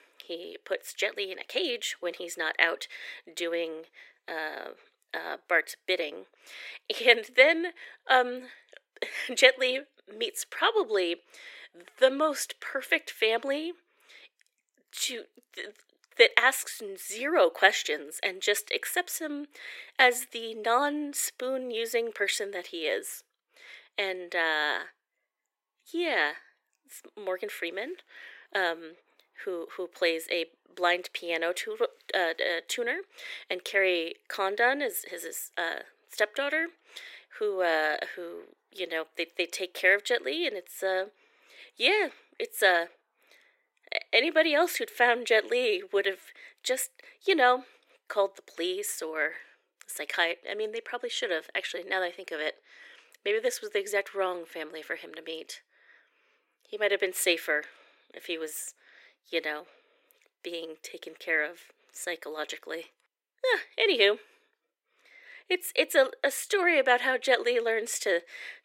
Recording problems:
thin; very; fading below 350 Hz

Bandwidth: 16 kHz